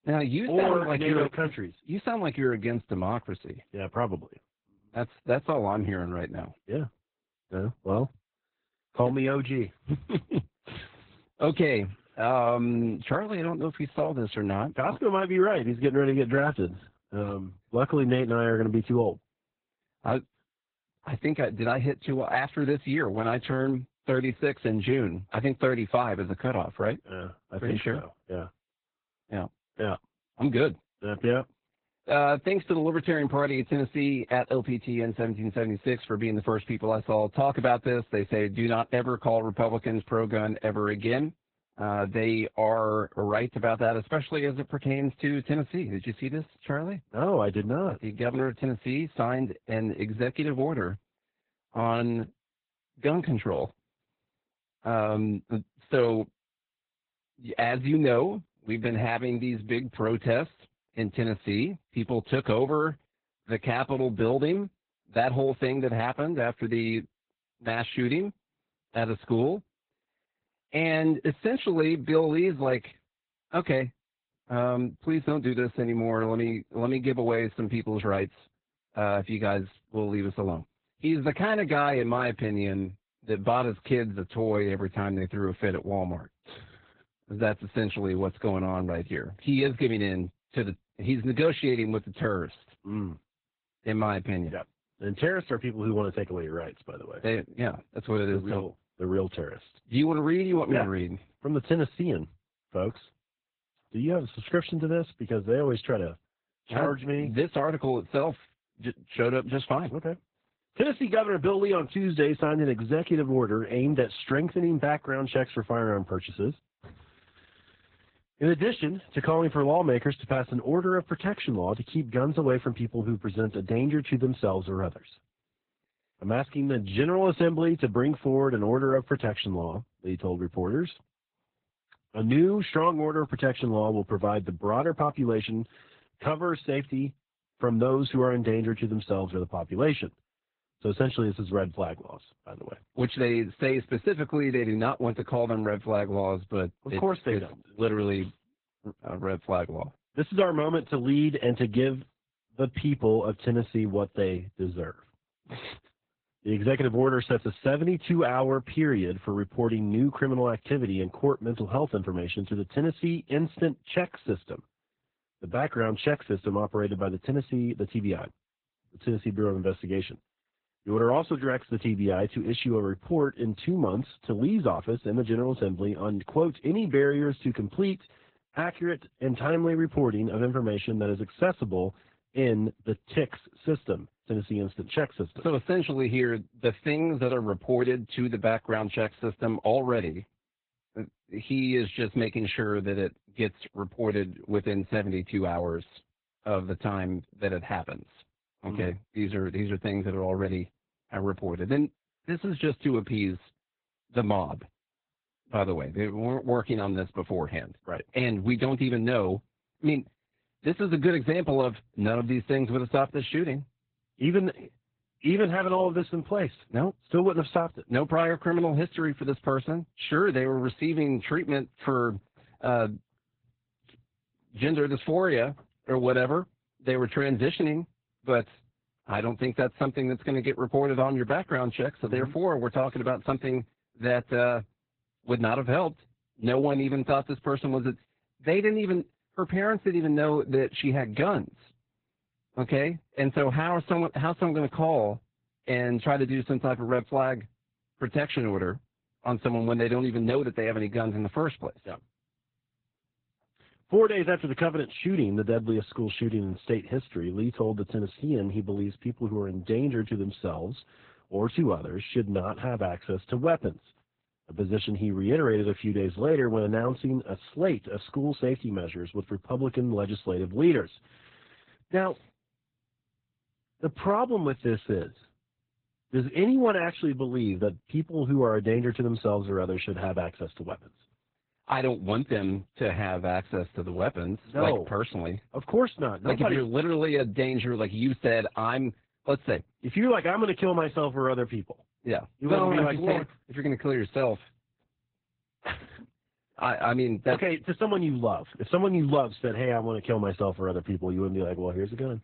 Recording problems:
garbled, watery; badly; nothing above 4 kHz

